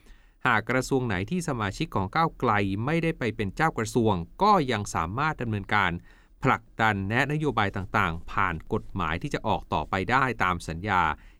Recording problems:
none

